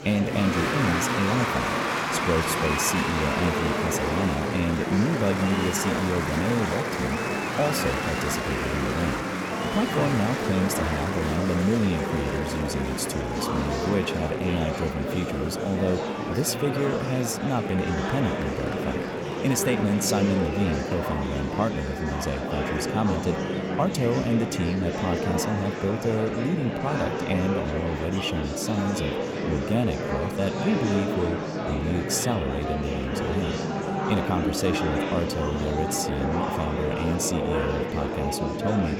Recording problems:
murmuring crowd; loud; throughout; as loud as the speech

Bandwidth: 17.5 kHz